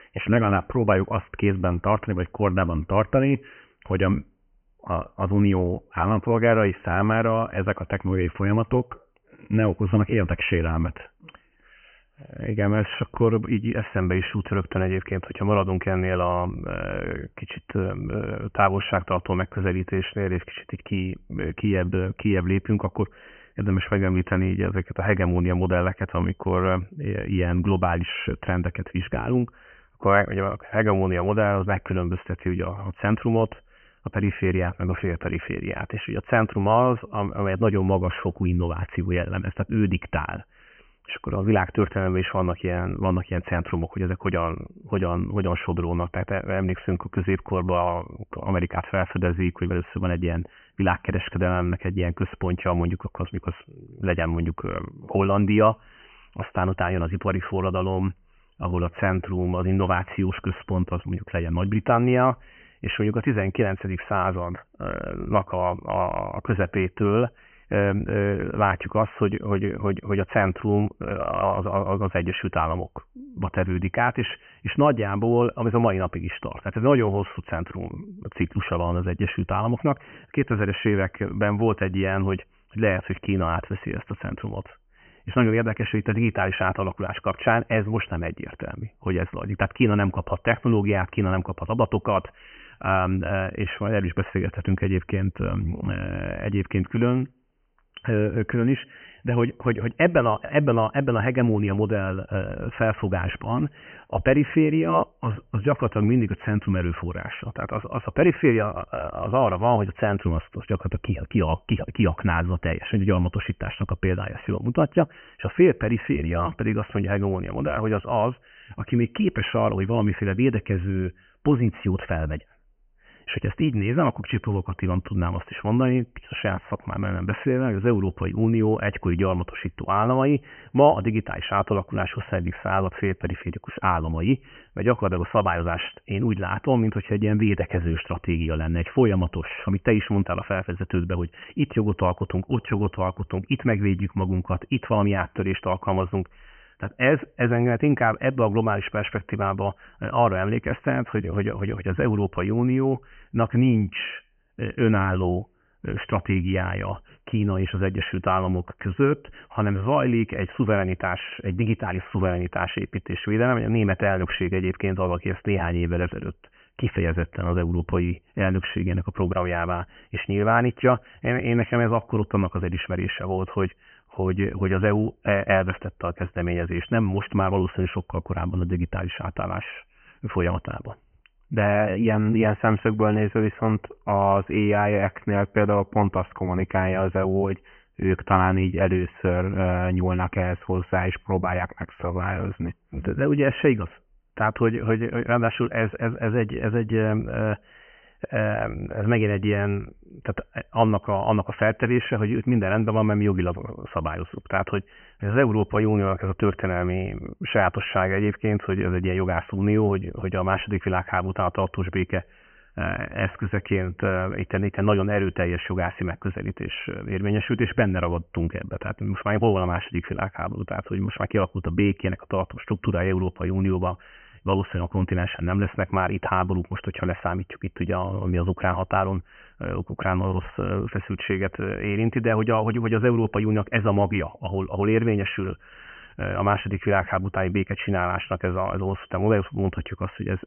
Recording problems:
high frequencies cut off; severe; nothing above 3 kHz
uneven, jittery; strongly; from 58 s to 3:13

